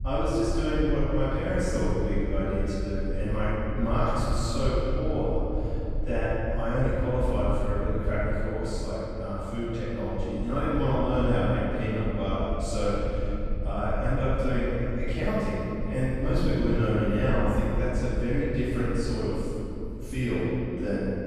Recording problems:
room echo; strong; dies away in 2.8 s
off-mic speech; far
low rumble; faint; throughout; 25 dB below the speech

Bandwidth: 15.5 kHz